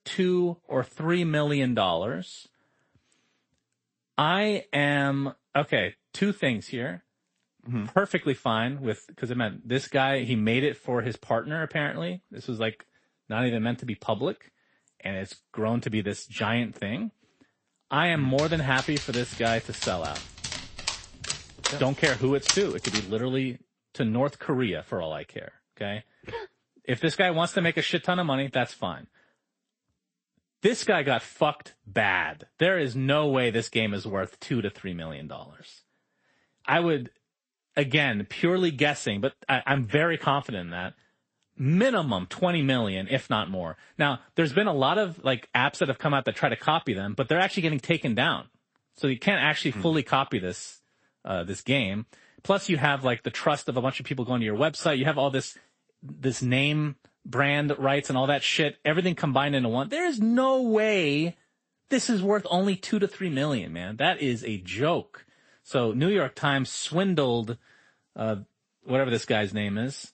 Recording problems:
garbled, watery; slightly; nothing above 8 kHz
dog barking; loud; from 18 to 23 s; peak 1 dB above the speech

